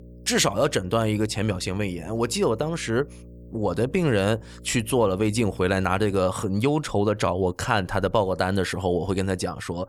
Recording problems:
electrical hum; faint; until 6 s; 60 Hz, 25 dB below the speech

